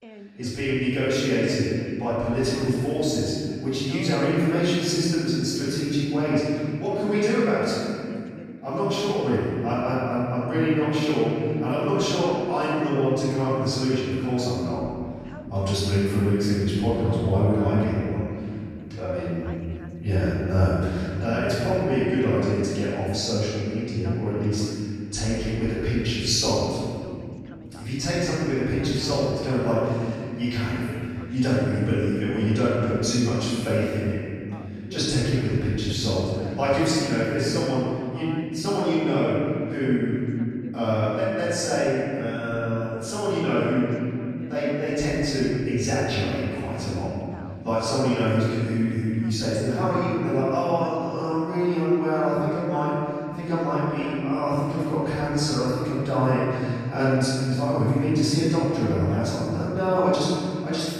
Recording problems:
room echo; strong; dies away in 2.9 s
off-mic speech; far
voice in the background; faint; throughout; 20 dB below the speech

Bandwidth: 14.5 kHz